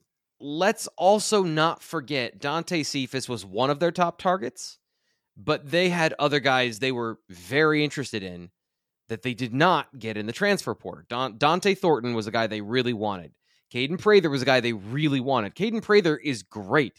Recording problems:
none

